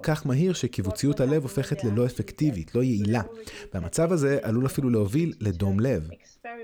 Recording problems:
voice in the background; noticeable; throughout; 20 dB below the speech

